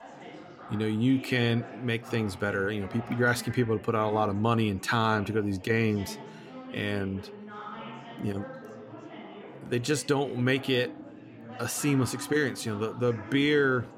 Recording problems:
chatter from many people; noticeable; throughout; 15 dB below the speech

